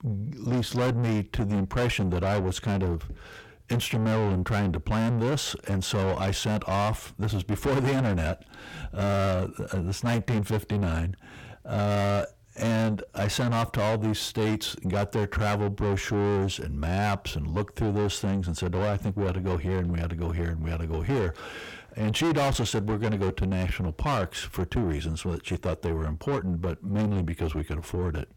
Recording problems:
distortion; heavy; 6 dB below the speech

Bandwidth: 17 kHz